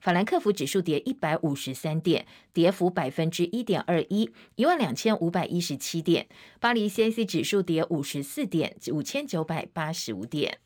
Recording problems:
none

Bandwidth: 17.5 kHz